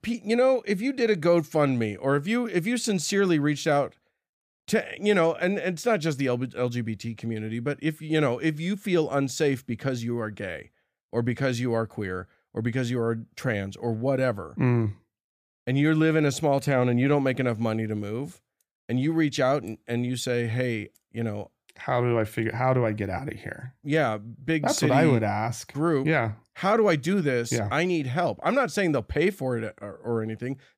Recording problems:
none

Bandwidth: 15 kHz